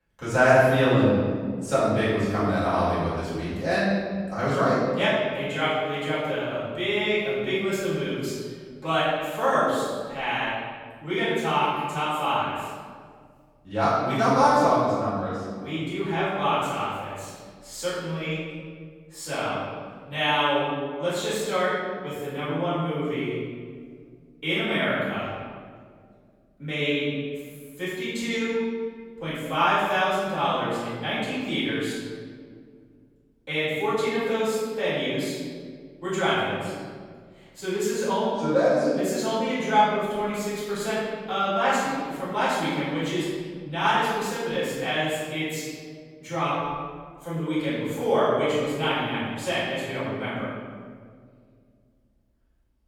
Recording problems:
room echo; strong; dies away in 1.7 s
off-mic speech; far

